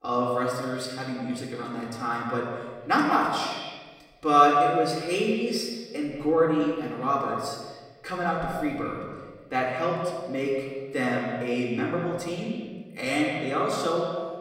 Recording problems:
echo of what is said; strong; throughout; 170 ms later, 6 dB below the speech
off-mic speech; far
room echo; noticeable; dies away in 1.3 s

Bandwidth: 16 kHz